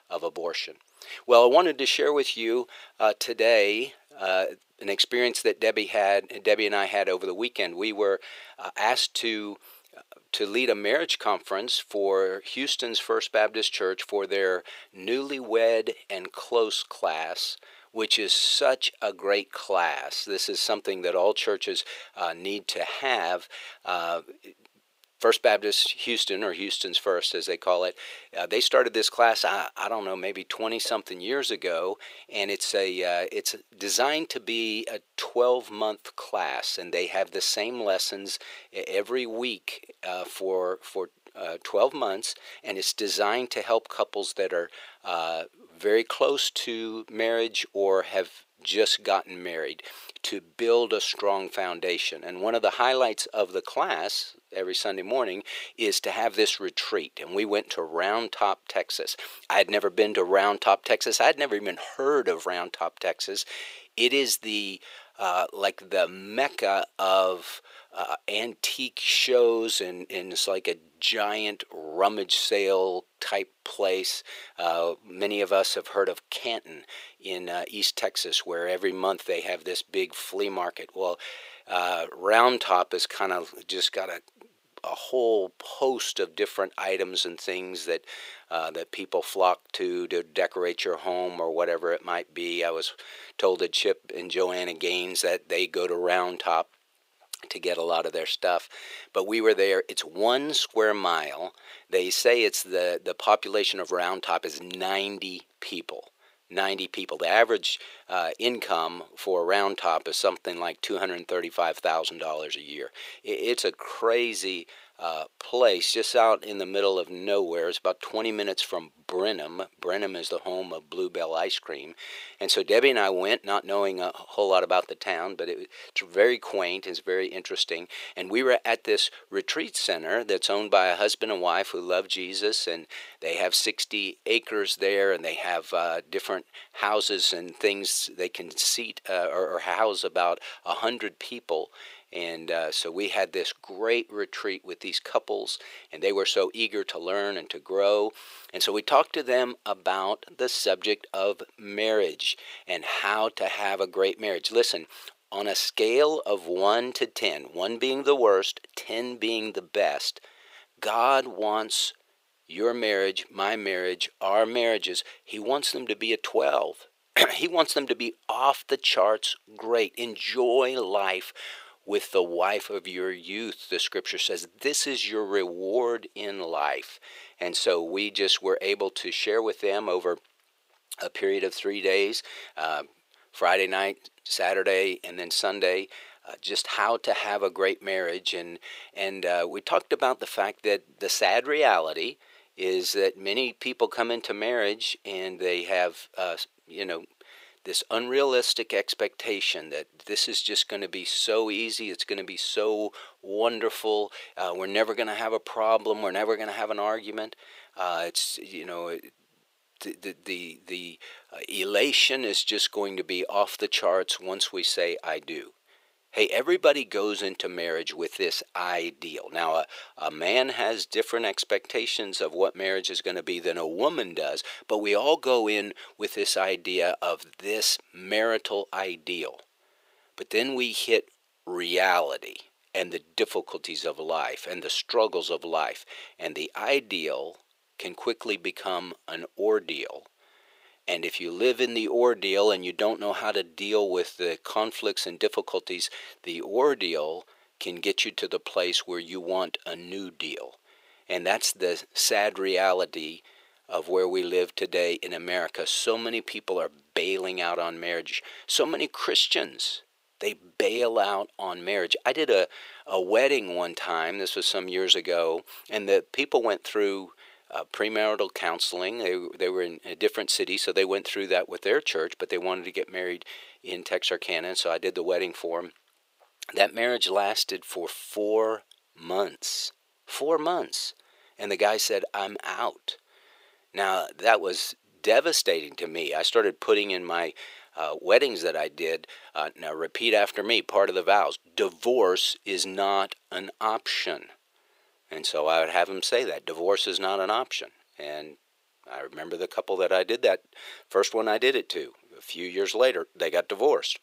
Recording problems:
thin; very; fading below 450 Hz

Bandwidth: 15.5 kHz